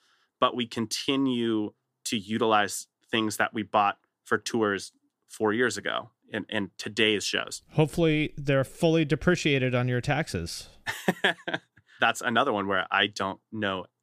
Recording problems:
none

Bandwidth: 15 kHz